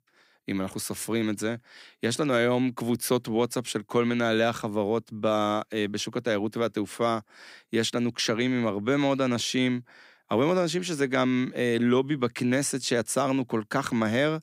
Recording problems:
none

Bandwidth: 15.5 kHz